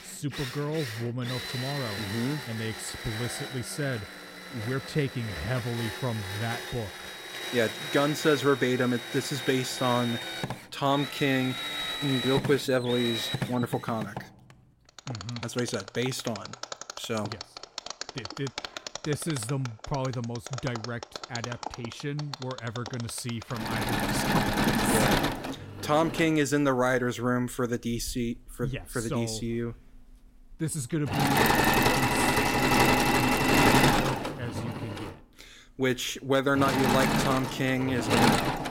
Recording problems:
machinery noise; very loud; throughout; 1 dB above the speech

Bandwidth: 16 kHz